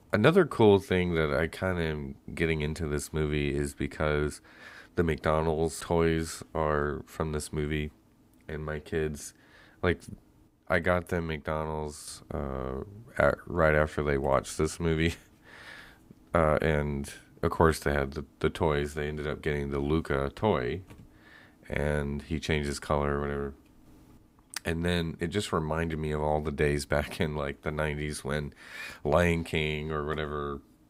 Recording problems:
none

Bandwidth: 15.5 kHz